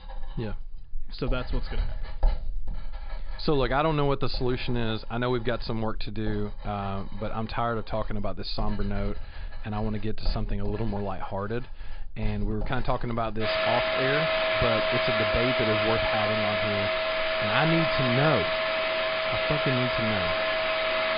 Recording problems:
high frequencies cut off; severe; nothing above 5 kHz
household noises; very loud; throughout; 3 dB above the speech

